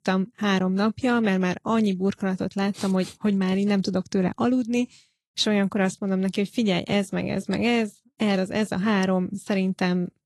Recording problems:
garbled, watery; slightly; nothing above 12 kHz

